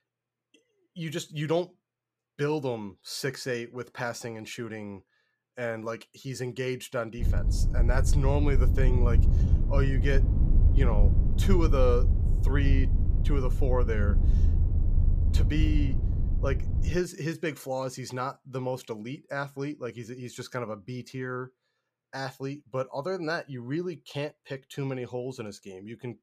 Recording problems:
low rumble; loud; from 7 to 17 s; 8 dB below the speech

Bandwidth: 14.5 kHz